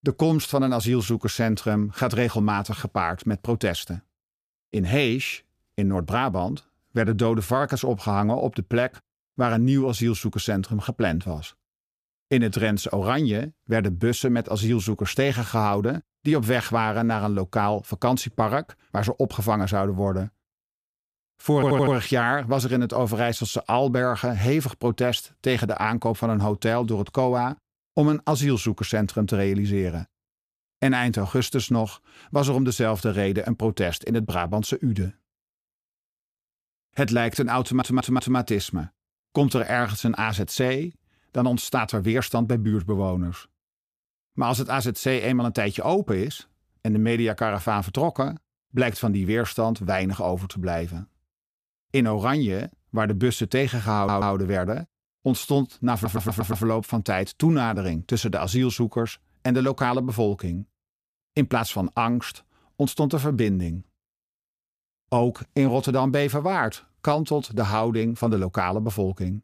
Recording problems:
audio stuttering; 4 times, first at 22 s

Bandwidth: 14.5 kHz